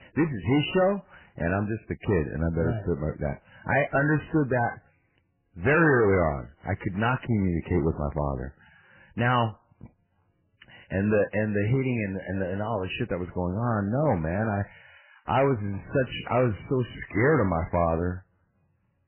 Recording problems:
garbled, watery; badly; nothing above 3 kHz
distortion; slight; 5% of the sound clipped

